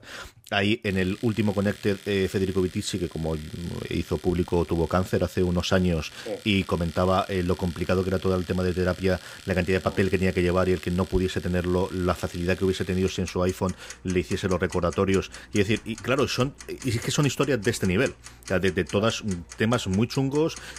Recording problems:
household noises; noticeable; throughout; 20 dB below the speech

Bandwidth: 15.5 kHz